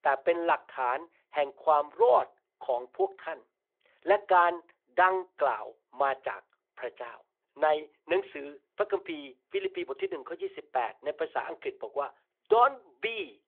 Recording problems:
phone-call audio; nothing above 3.5 kHz

